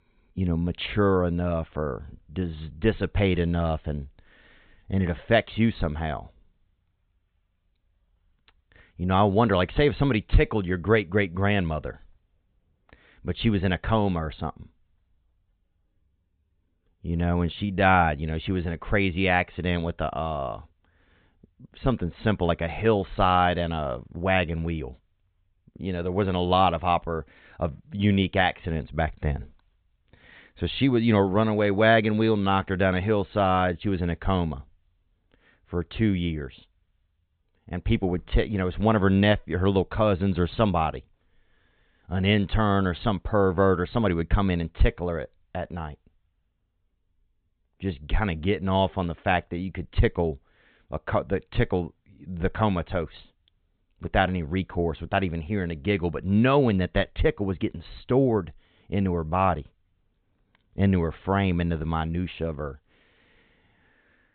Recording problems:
high frequencies cut off; severe; nothing above 4 kHz

